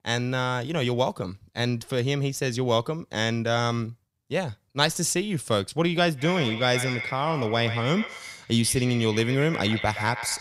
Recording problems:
echo of what is said; strong; from 6 s on; 120 ms later, 8 dB below the speech

